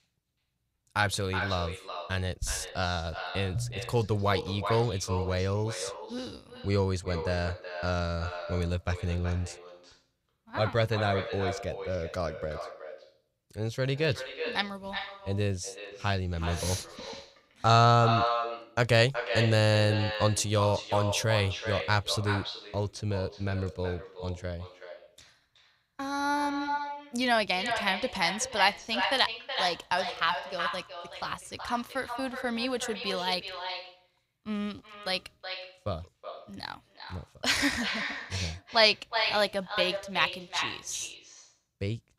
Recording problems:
echo of what is said; strong; throughout; 370 ms later, 6 dB below the speech

